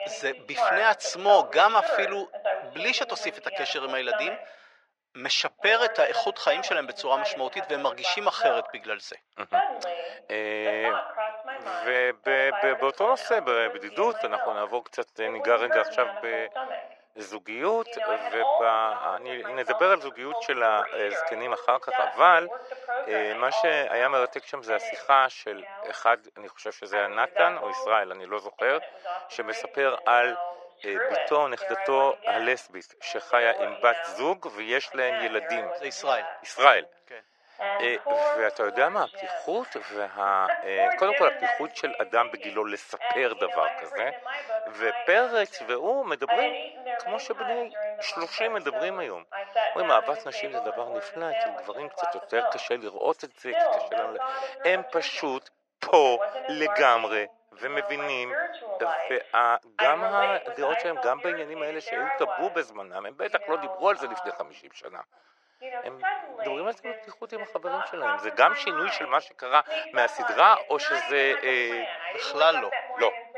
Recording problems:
thin; very; fading below 550 Hz
muffled; slightly; fading above 2 kHz
voice in the background; loud; throughout; 5 dB below the speech

